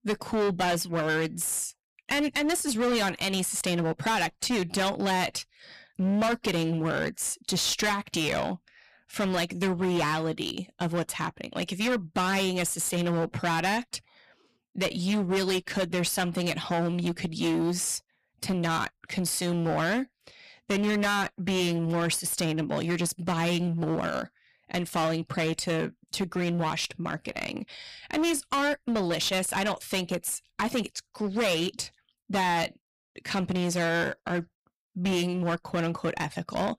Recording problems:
distortion; heavy; 16% of the sound clipped

